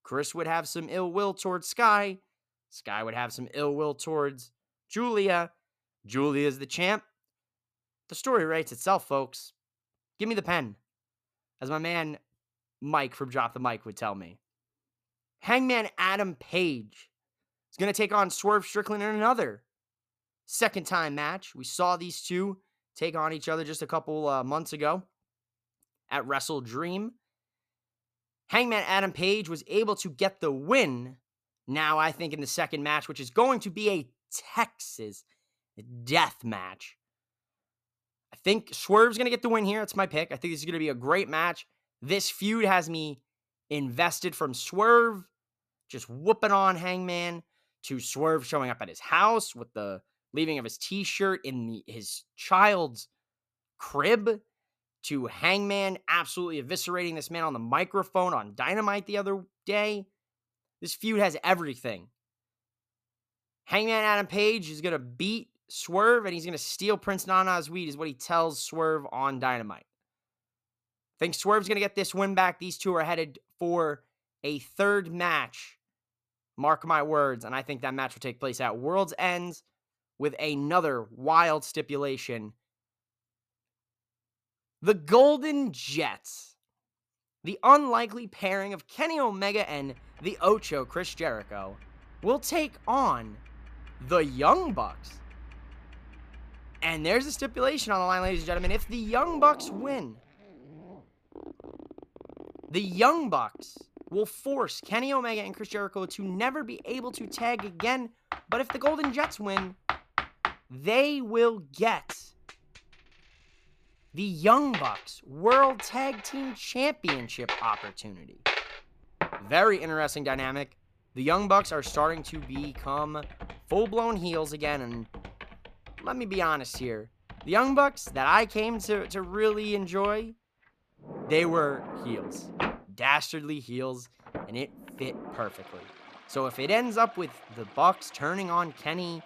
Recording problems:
household noises; noticeable; from 1:30 on; 10 dB below the speech

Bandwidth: 14.5 kHz